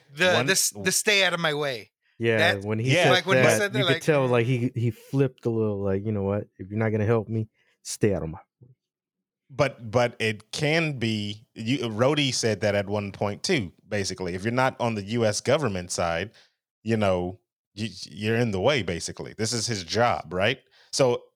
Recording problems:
none

